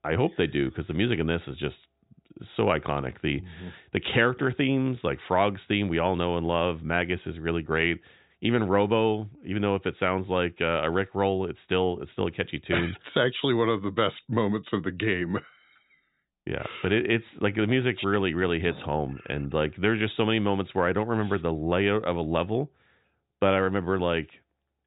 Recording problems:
high frequencies cut off; severe; nothing above 4 kHz

